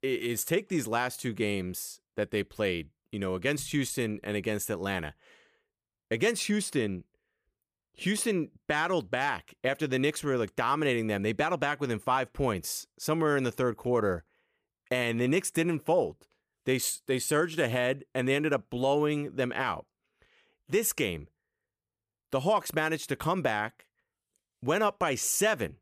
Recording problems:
none

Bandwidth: 15 kHz